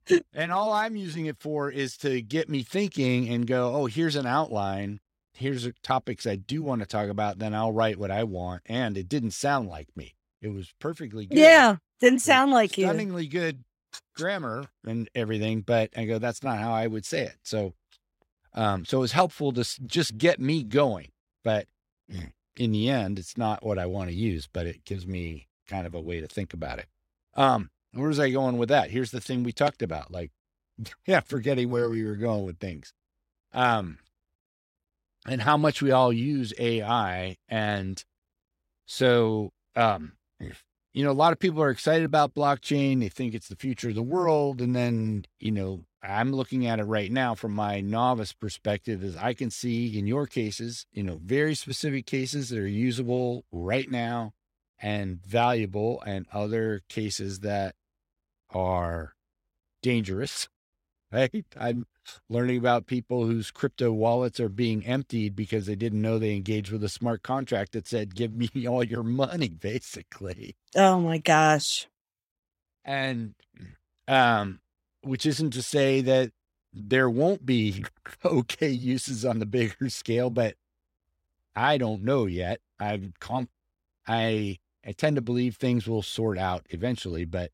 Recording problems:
none

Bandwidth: 16 kHz